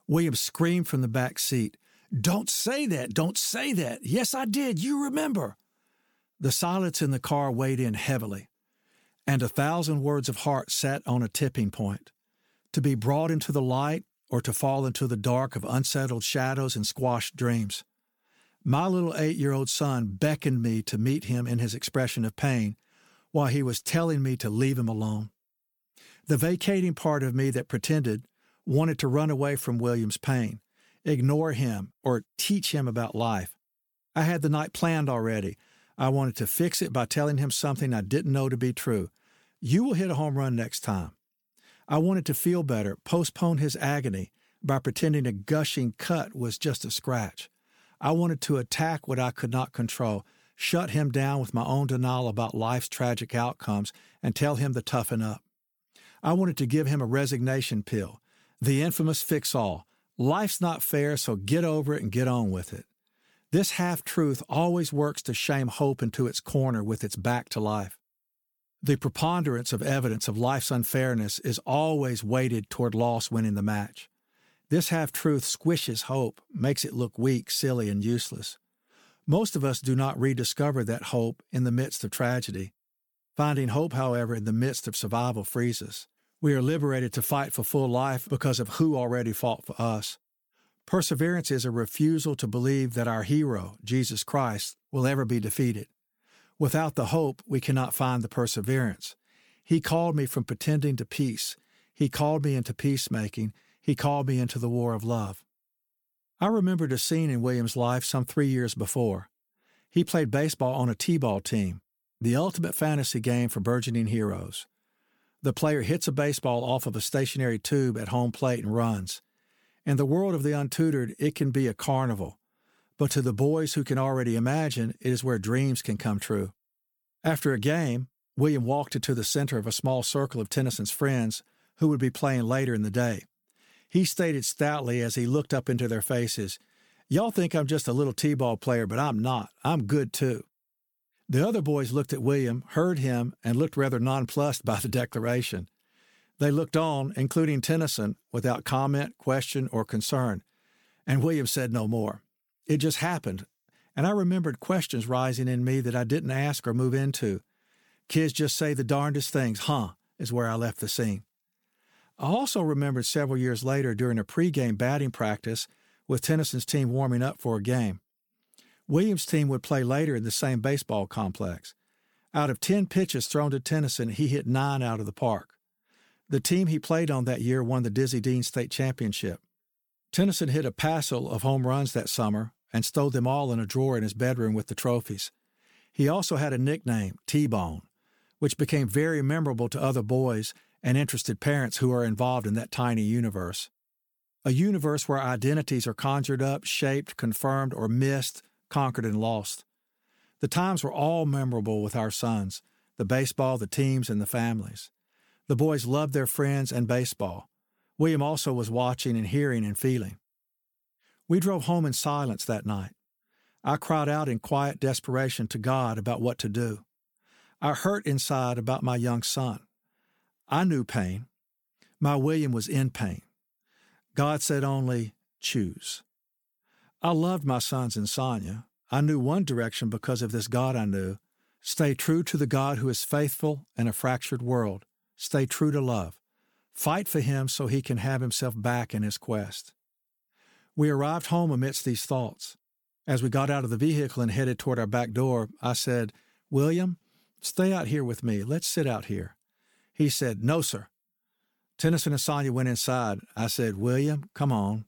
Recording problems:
none

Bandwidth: 18.5 kHz